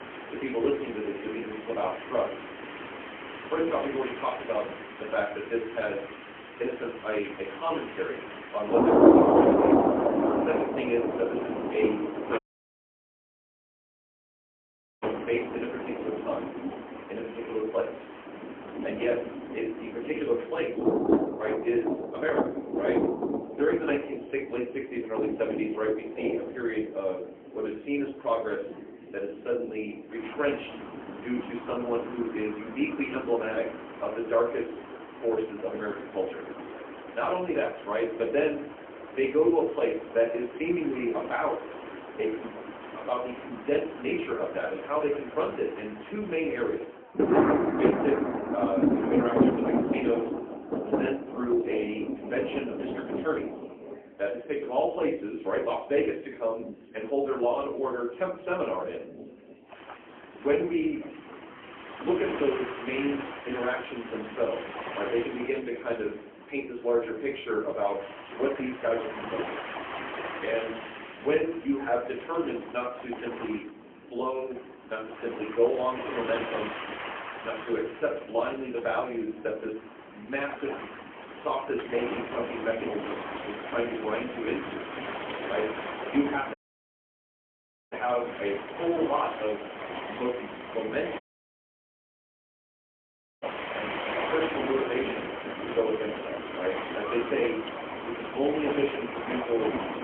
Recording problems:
phone-call audio; poor line
off-mic speech; far
room echo; slight; dies away in 0.4 s
rain or running water; loud; throughout; 1 dB below the speech
murmuring crowd; faint; throughout; 25 dB below the speech
audio cutting out; at 12 s for 2.5 s, at 1:27 for 1.5 s and at 1:31 for 2 s

